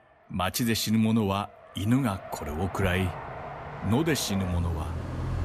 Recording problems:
traffic noise; loud; throughout; 10 dB below the speech

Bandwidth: 14.5 kHz